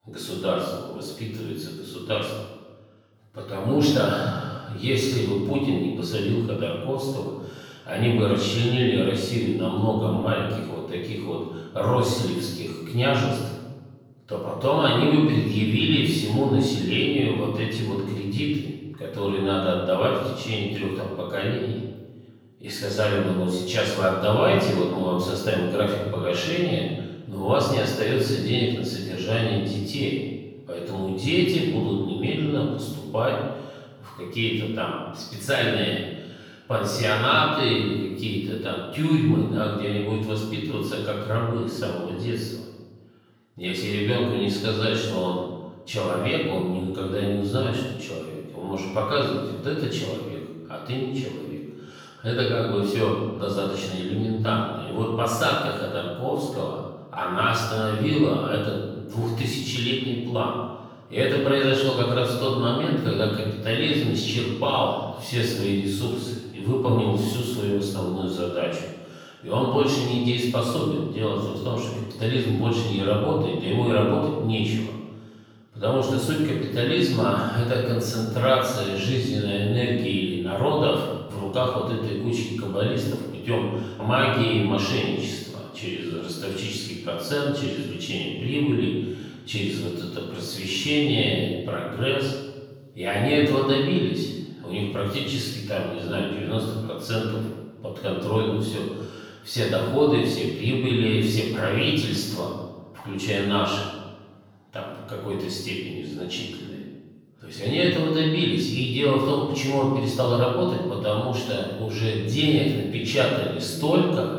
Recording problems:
off-mic speech; far
room echo; noticeable; dies away in 1 s

